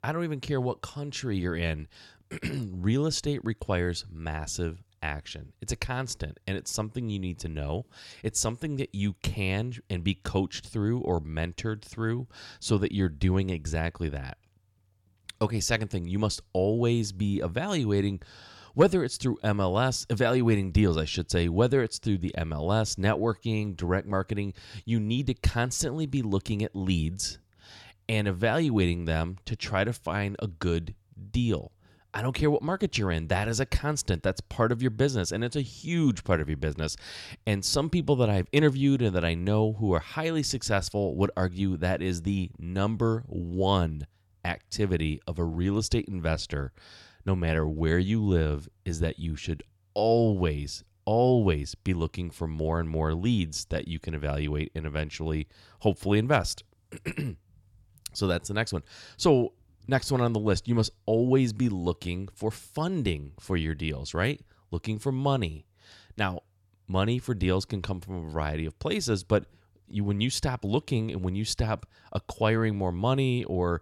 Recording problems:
none

